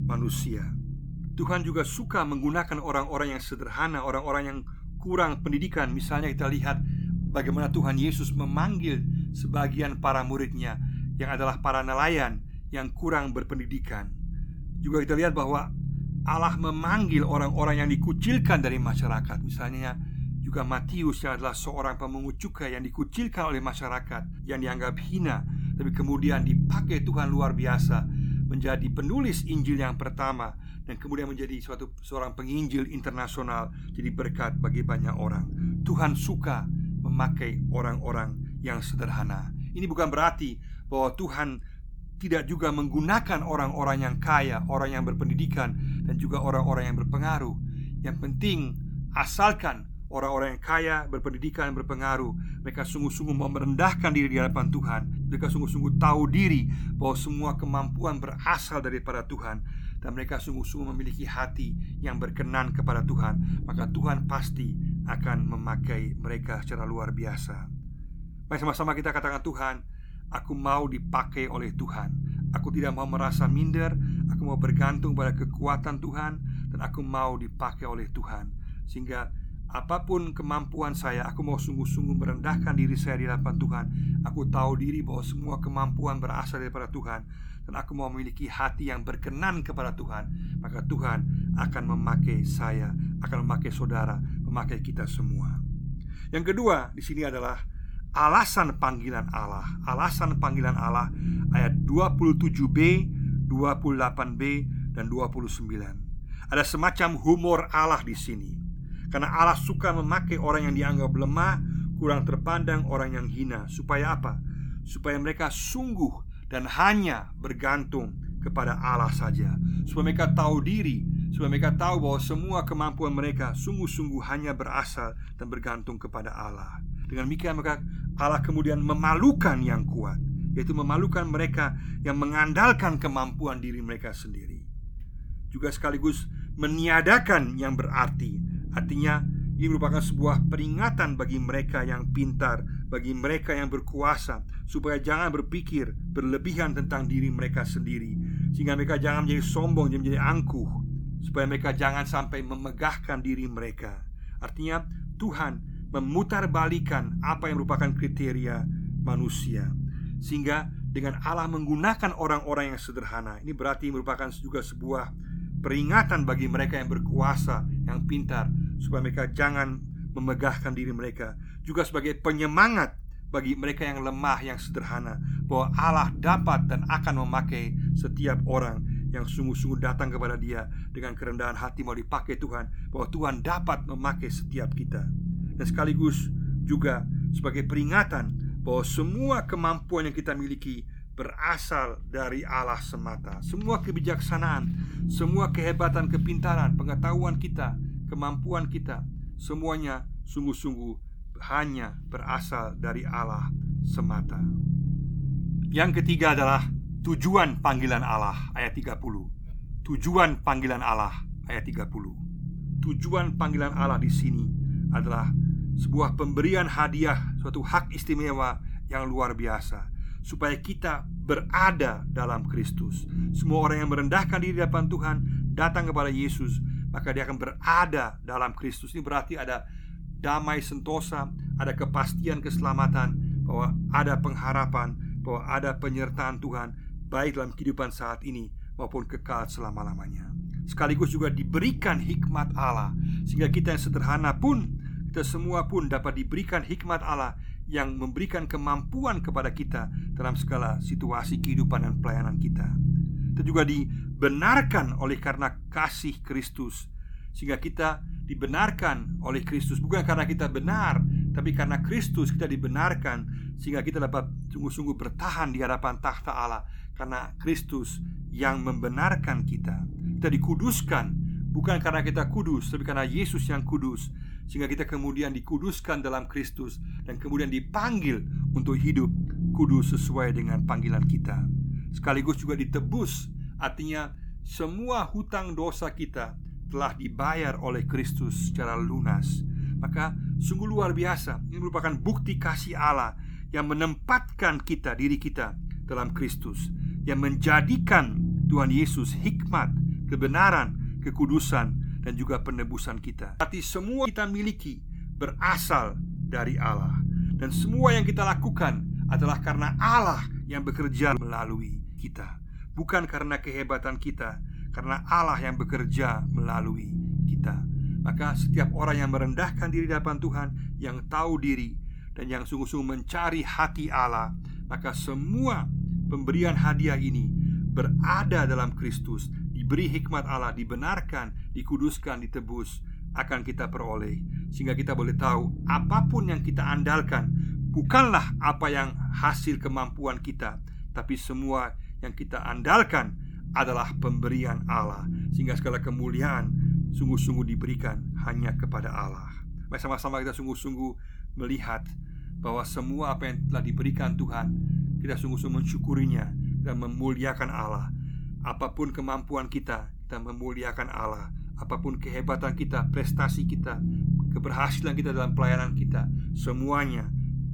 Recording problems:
low rumble; noticeable; throughout; 10 dB below the speech

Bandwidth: 18 kHz